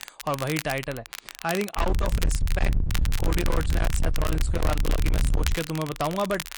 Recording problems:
distortion; heavy; 29% of the sound clipped
garbled, watery; slightly; nothing above 10 kHz
low rumble; loud; from 2 to 5.5 s; 7 dB below the speech
crackle, like an old record; loud; 7 dB below the speech

